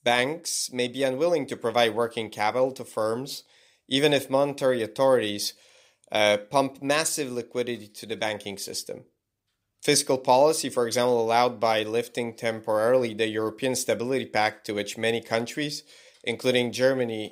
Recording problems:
none

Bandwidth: 15.5 kHz